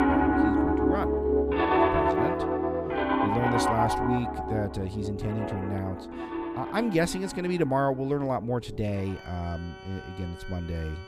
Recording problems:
background music; very loud; throughout; 4 dB above the speech

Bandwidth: 14.5 kHz